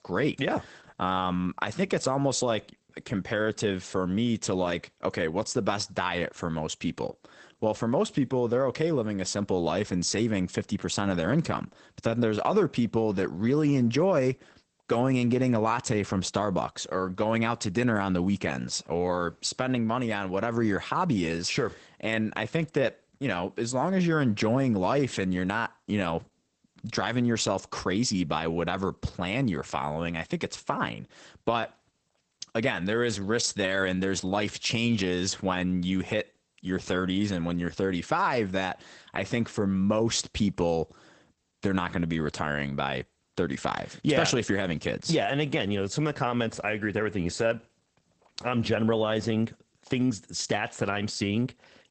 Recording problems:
garbled, watery; badly; nothing above 8 kHz

